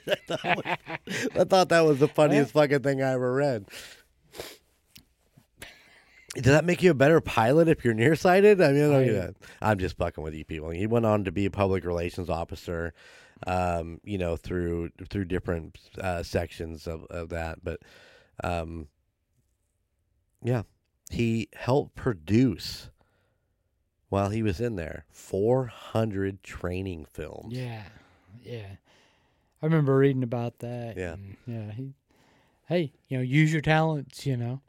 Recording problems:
none

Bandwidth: 16 kHz